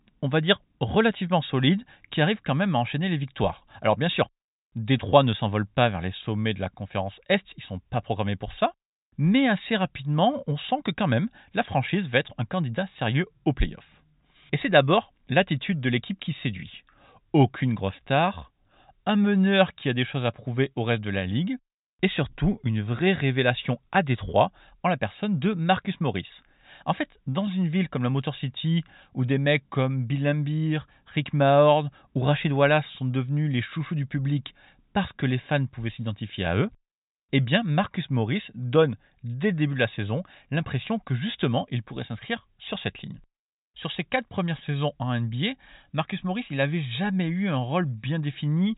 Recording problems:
high frequencies cut off; severe; nothing above 4 kHz

